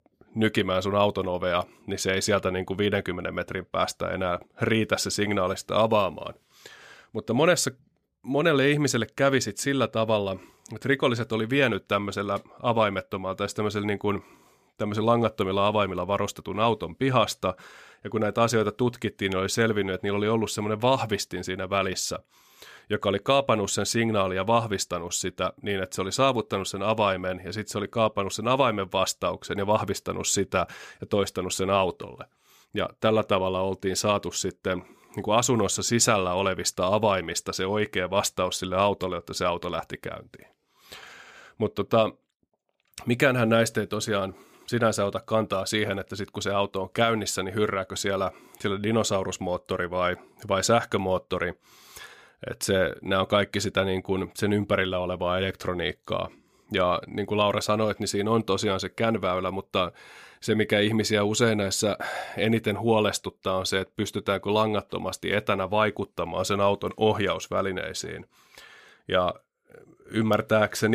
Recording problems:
abrupt cut into speech; at the end

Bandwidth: 15 kHz